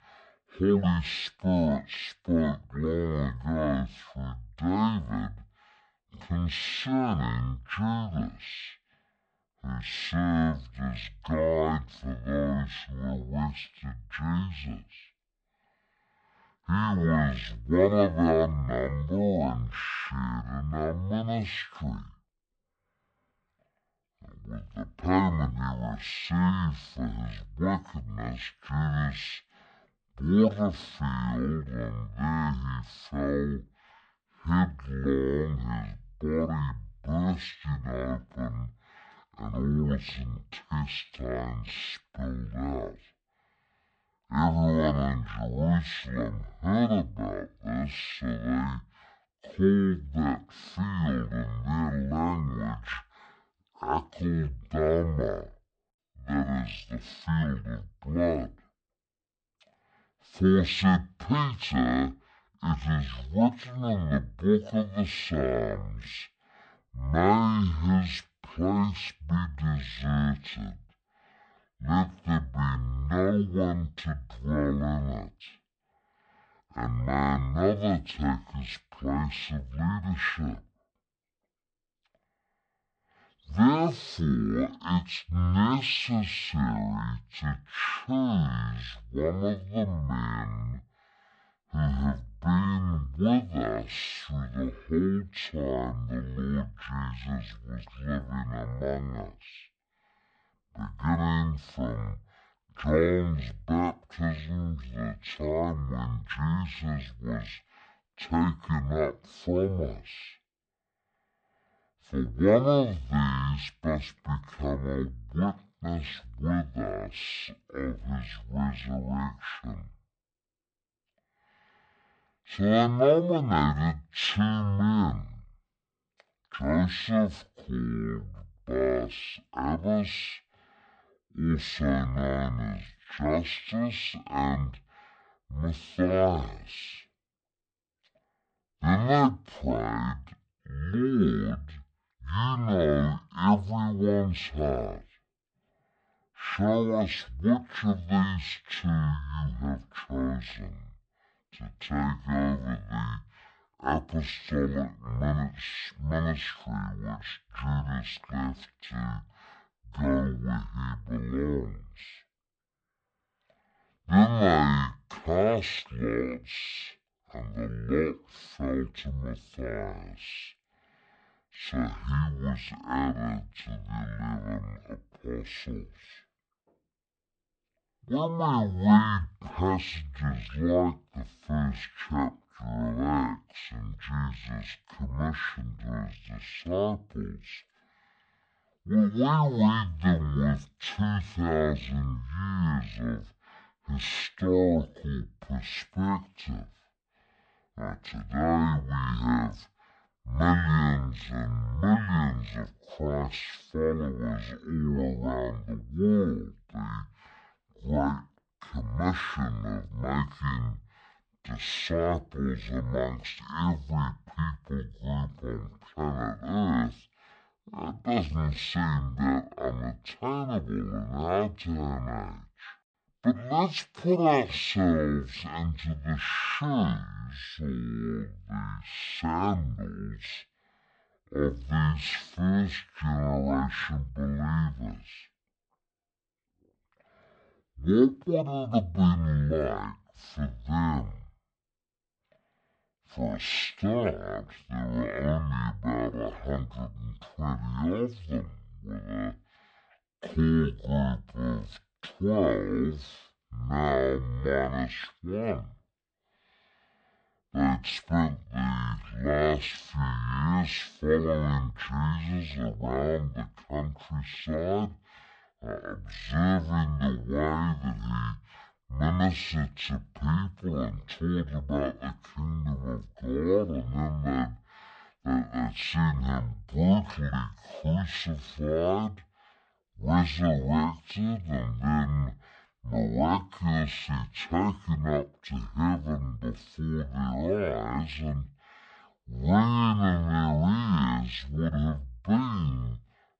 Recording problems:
wrong speed and pitch; too slow and too low; 0.5 times normal speed

